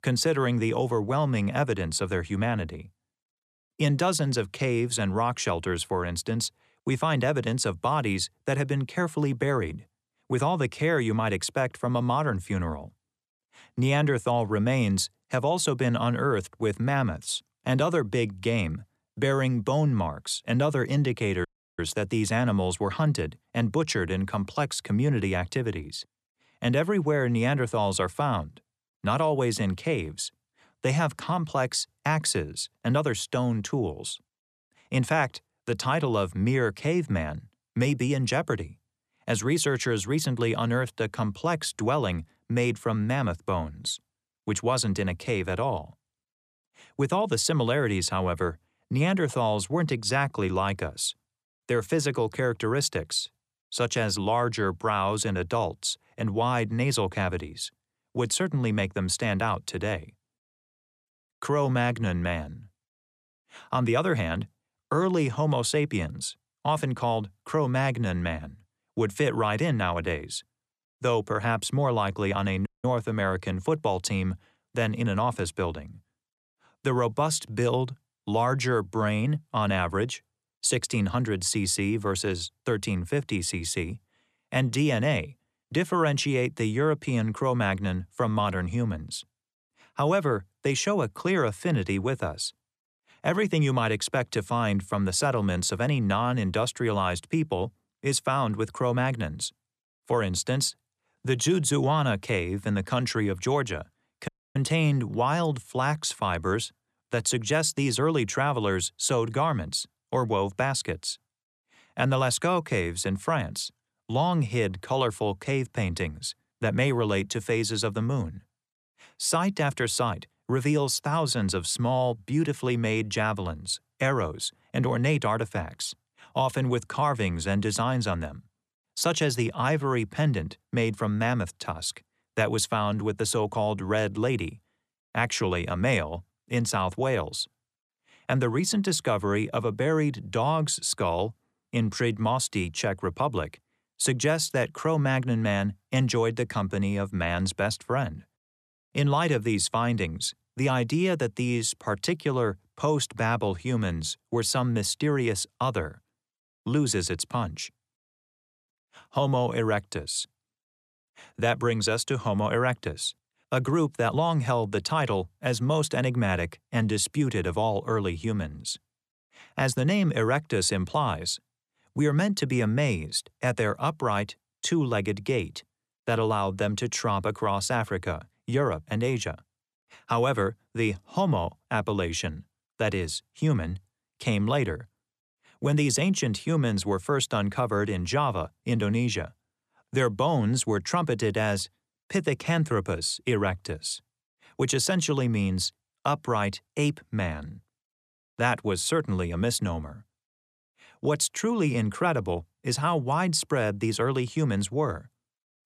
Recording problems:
audio cutting out; at 21 s, at 1:13 and at 1:44

